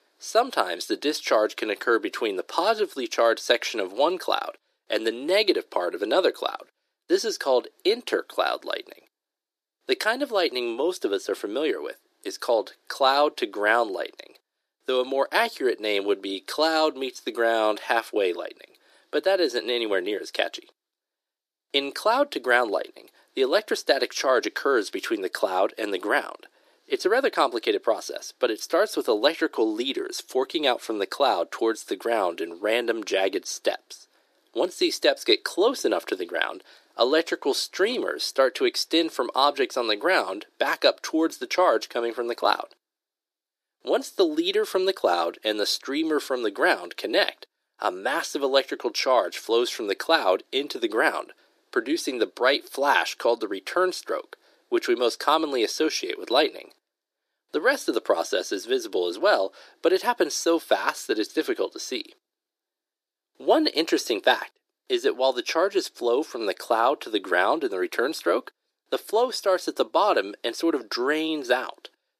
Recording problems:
thin; very; fading below 350 Hz

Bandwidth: 14.5 kHz